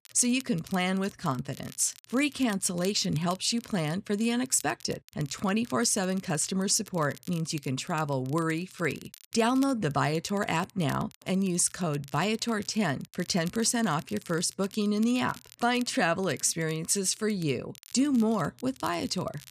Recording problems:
crackle, like an old record; faint; 20 dB below the speech

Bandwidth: 14.5 kHz